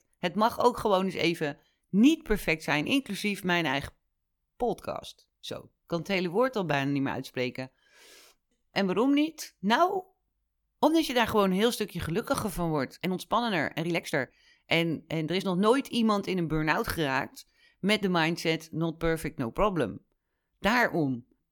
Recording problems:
uneven, jittery; strongly; from 2 to 15 s

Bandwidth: 18 kHz